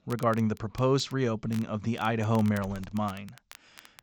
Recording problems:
high frequencies cut off; noticeable; nothing above 8 kHz
crackle, like an old record; faint; 20 dB below the speech
hiss; very faint; throughout; 25 dB below the speech

